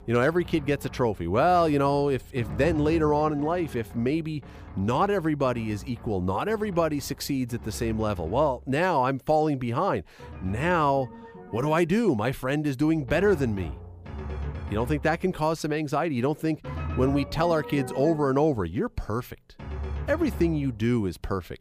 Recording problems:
background music; noticeable; throughout; 15 dB below the speech

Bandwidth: 15 kHz